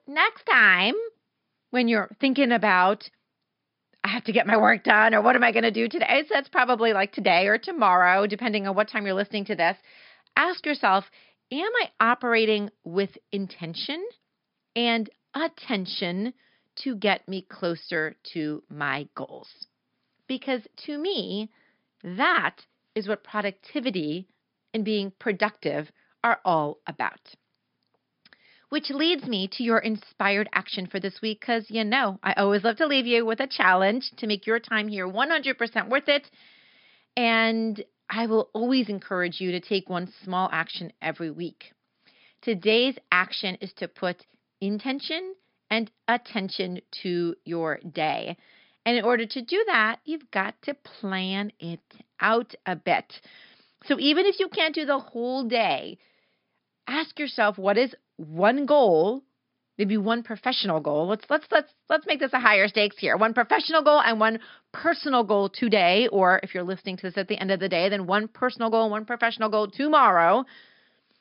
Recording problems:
high frequencies cut off; noticeable; nothing above 5.5 kHz

